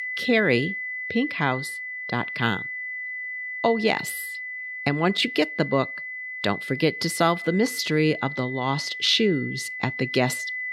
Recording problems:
high-pitched whine; loud; throughout; 2 kHz, 6 dB below the speech

